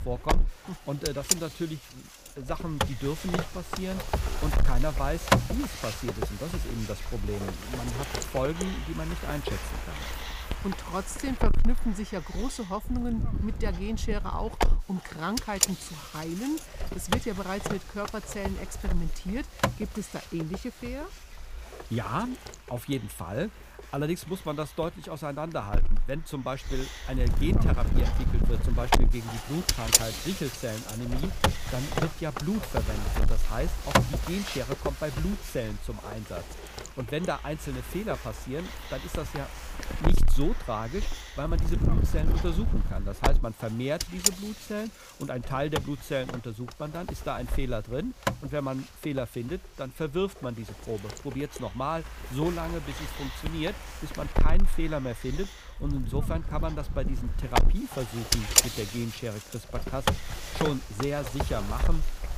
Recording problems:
wind noise on the microphone; heavy; 3 dB above the speech

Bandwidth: 15 kHz